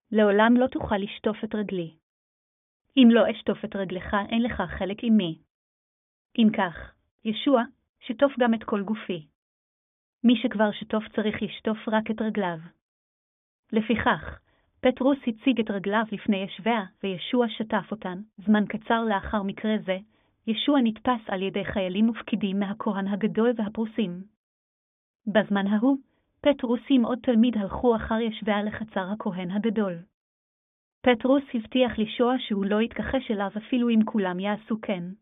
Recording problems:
high frequencies cut off; severe; nothing above 3.5 kHz

